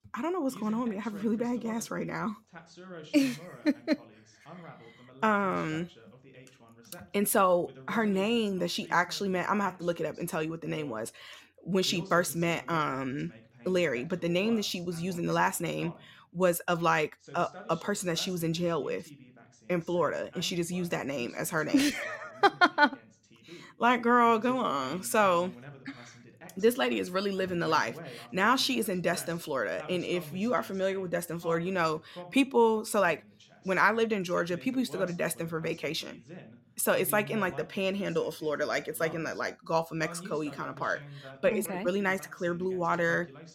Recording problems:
voice in the background; faint; throughout; 20 dB below the speech

